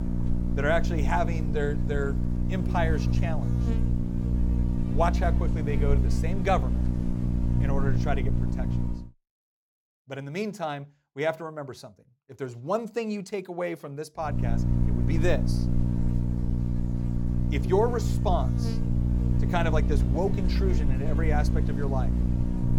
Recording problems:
electrical hum; loud; until 9 s and from 14 s on; 60 Hz, 7 dB below the speech

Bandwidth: 17 kHz